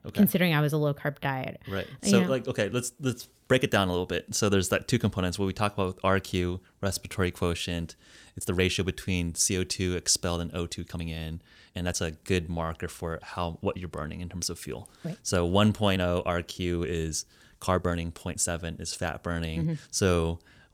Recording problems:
uneven, jittery; strongly; from 1 to 20 s

